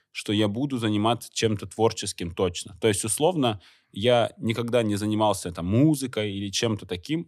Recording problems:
none

